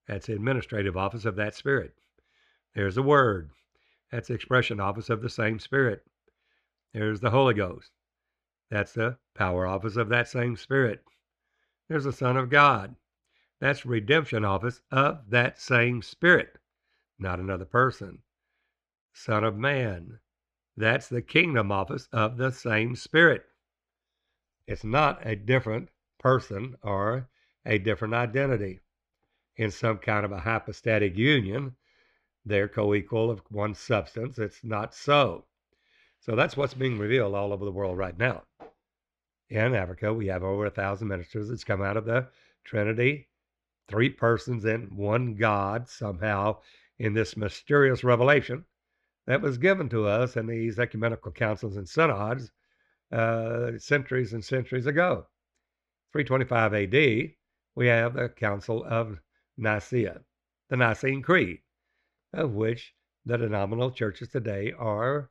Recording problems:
muffled; slightly; fading above 3 kHz

